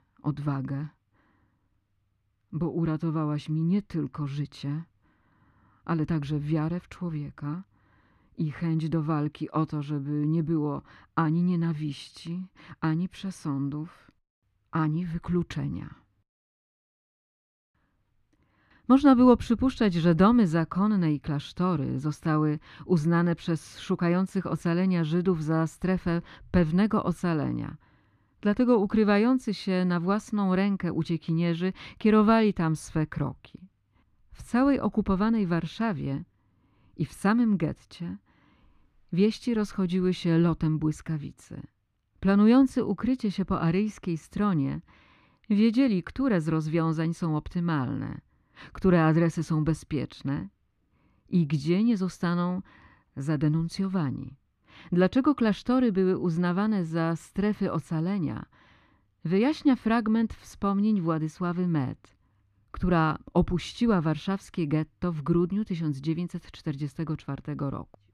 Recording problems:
muffled; slightly; fading above 4 kHz

